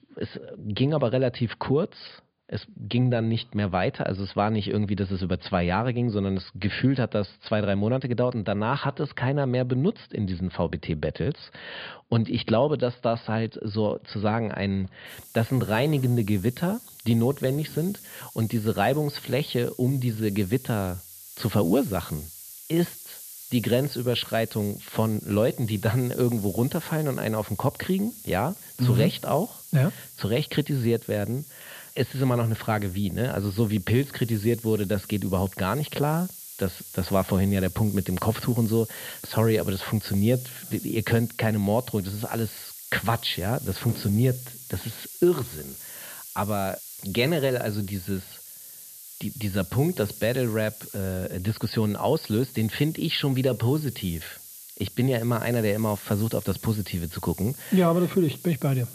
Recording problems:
high frequencies cut off; severe; nothing above 5 kHz
hiss; noticeable; from 15 s on; 15 dB below the speech

